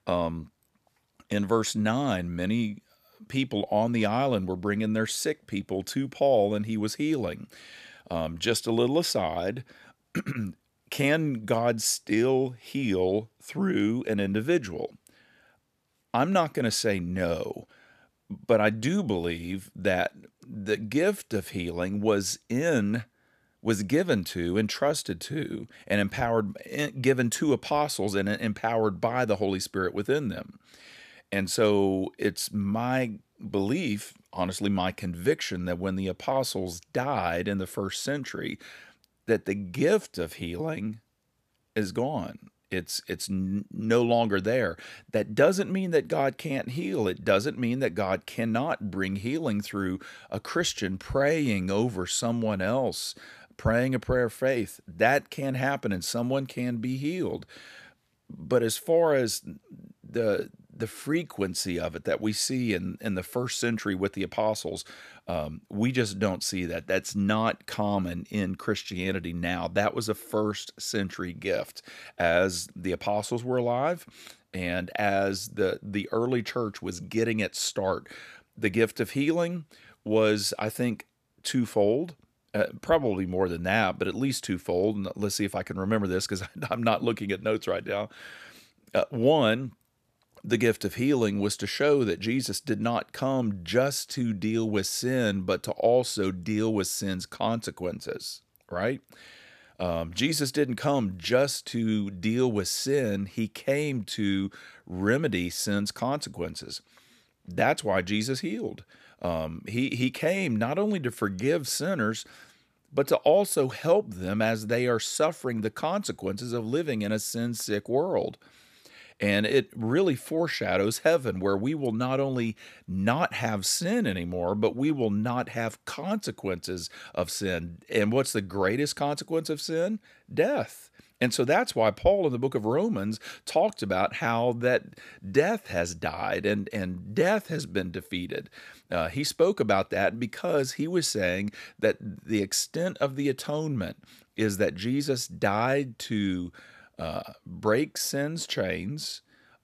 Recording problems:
none

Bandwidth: 14.5 kHz